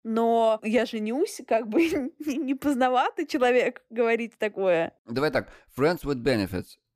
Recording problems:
none

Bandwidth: 15 kHz